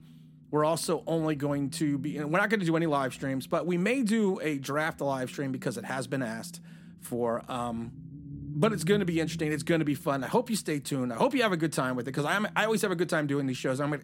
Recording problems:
low rumble; faint; throughout; 25 dB below the speech

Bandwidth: 16.5 kHz